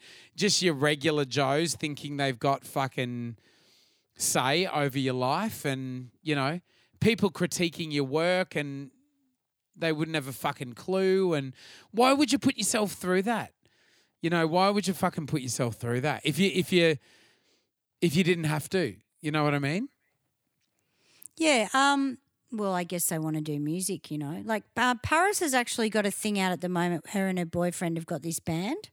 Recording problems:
none

